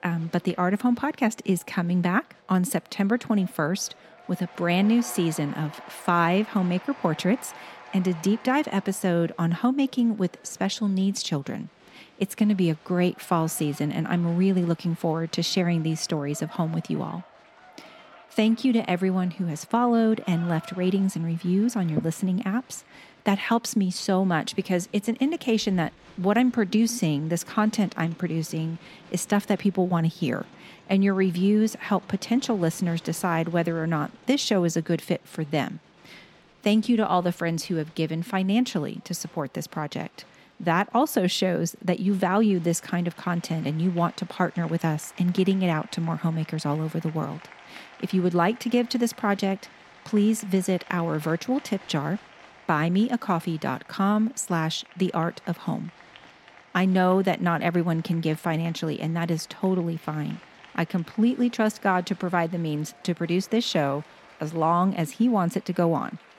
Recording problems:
crowd noise; faint; throughout; 25 dB below the speech

